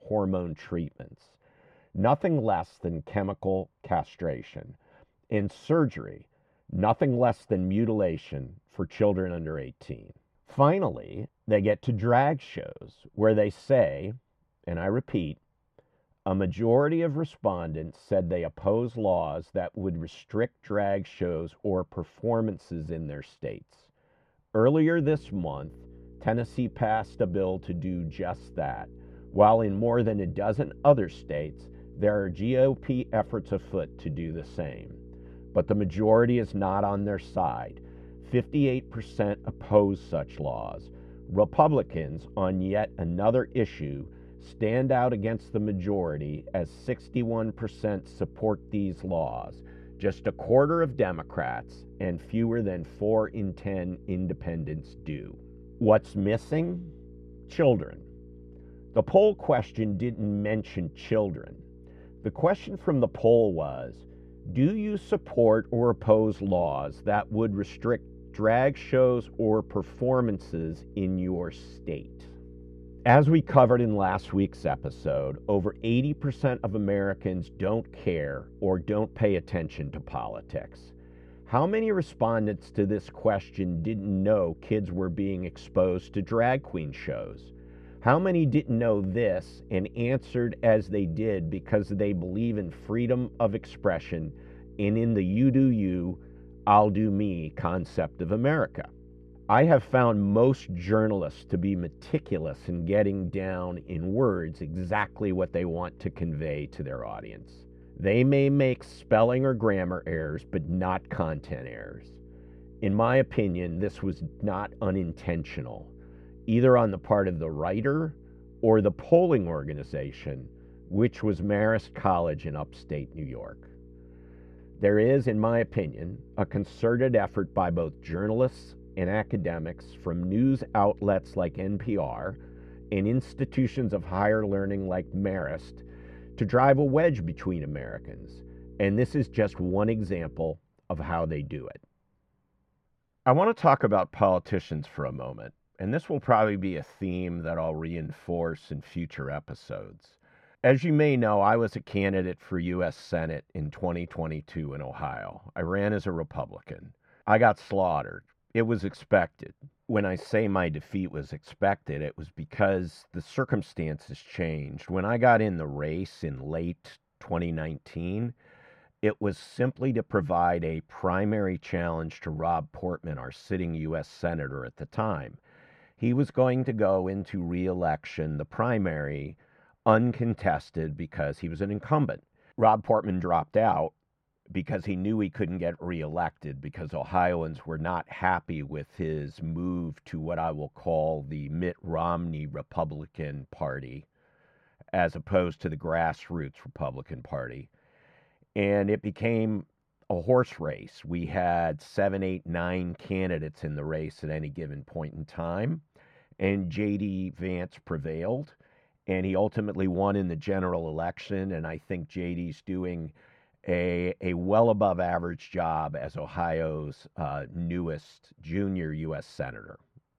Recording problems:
muffled; very; fading above 2.5 kHz
electrical hum; faint; from 25 s to 2:20; 60 Hz, 25 dB below the speech

